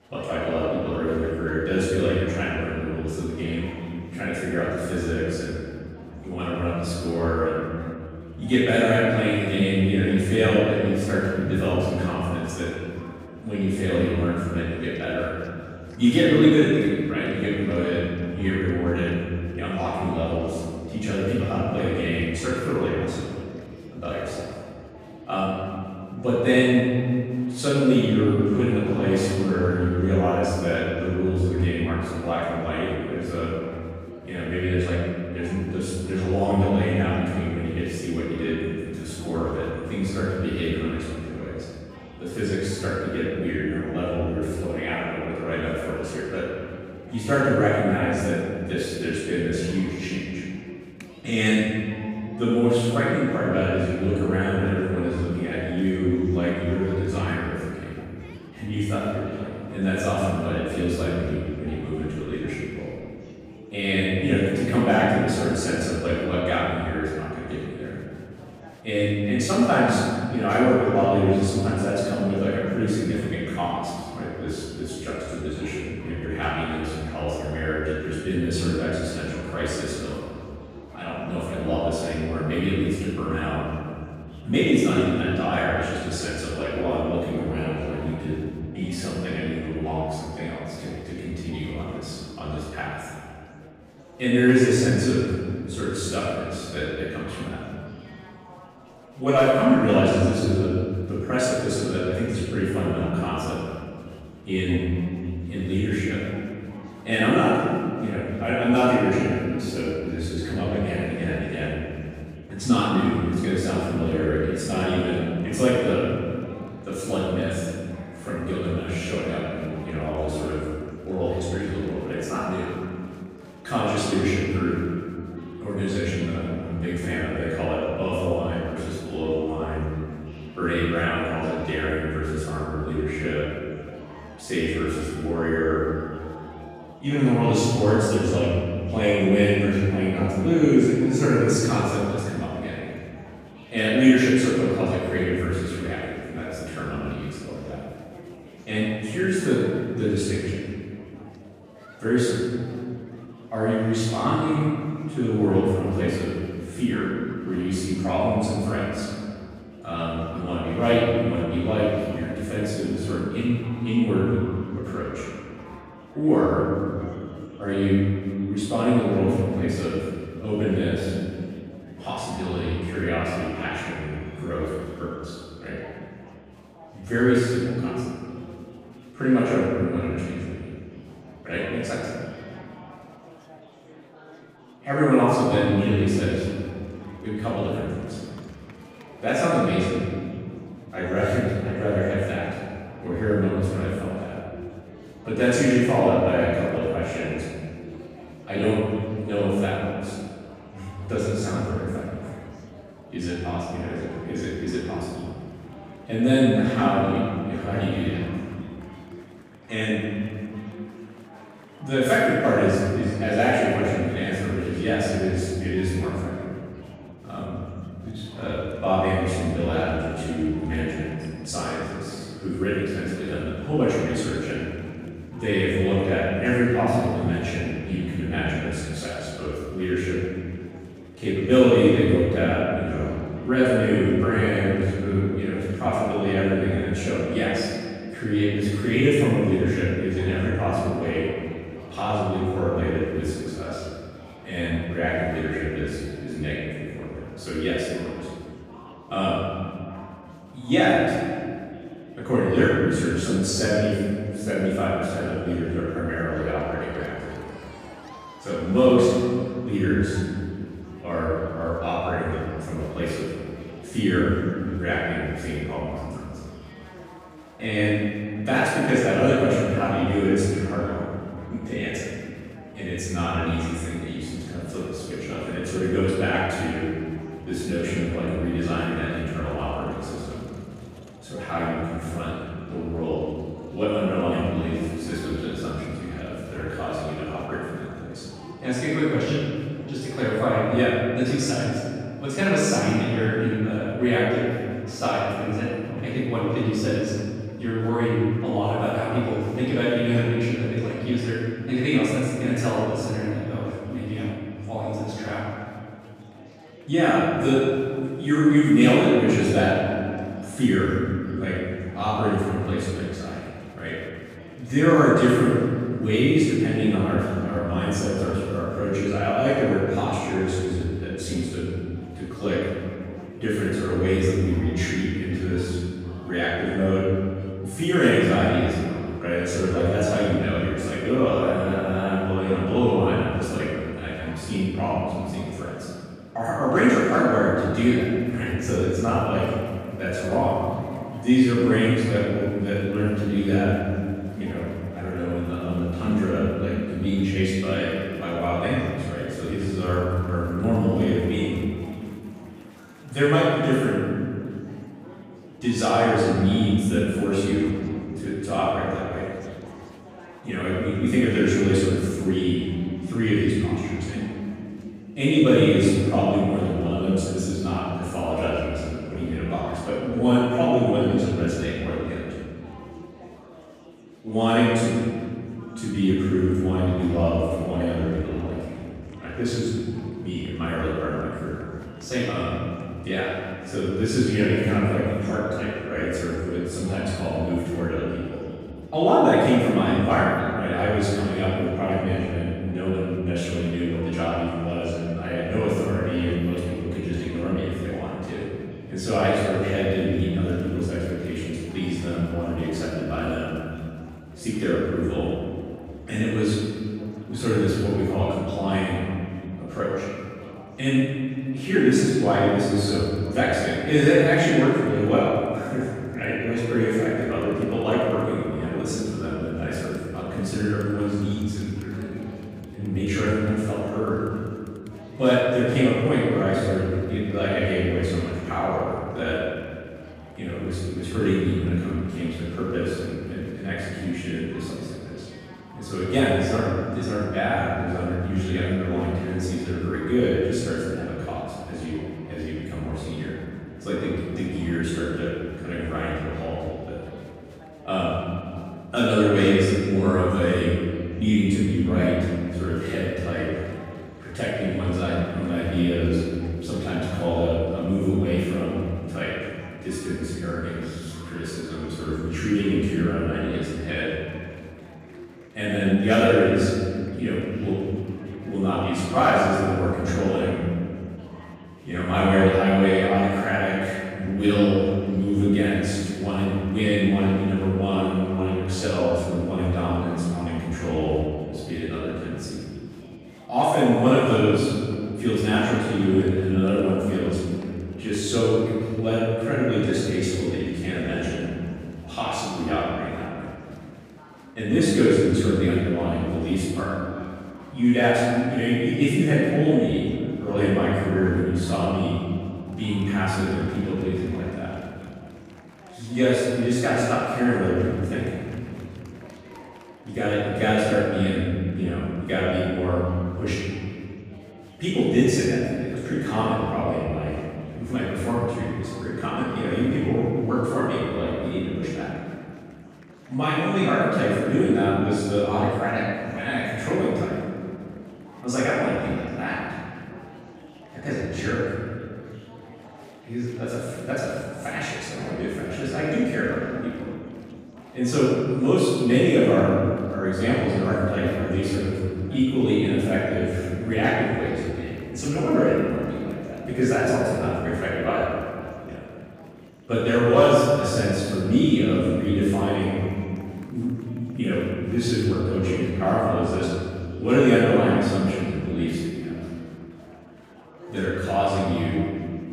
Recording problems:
room echo; strong; dies away in 2.3 s
off-mic speech; far
murmuring crowd; faint; throughout; 25 dB below the speech

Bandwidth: 15.5 kHz